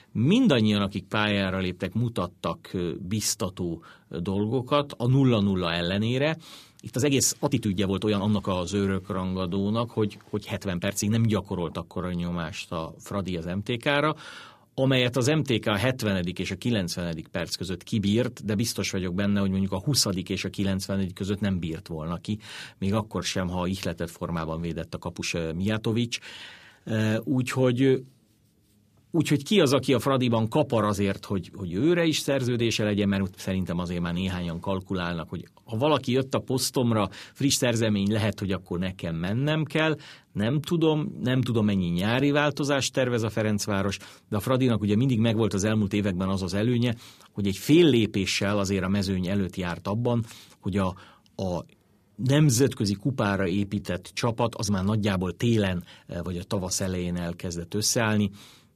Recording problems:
uneven, jittery; strongly; from 1 to 57 s

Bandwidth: 14.5 kHz